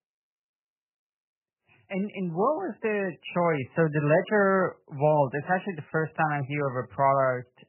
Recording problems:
garbled, watery; badly; nothing above 3 kHz

